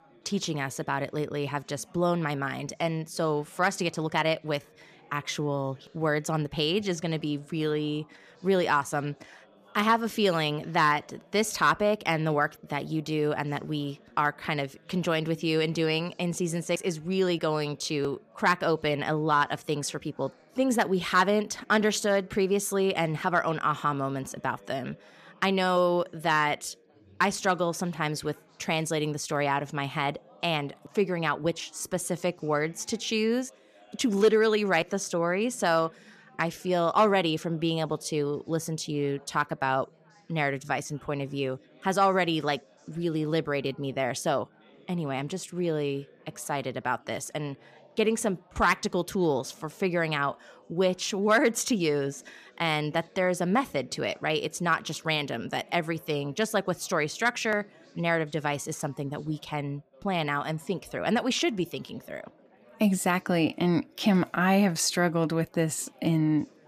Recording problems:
chatter from many people; faint; throughout; 30 dB below the speech

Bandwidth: 14.5 kHz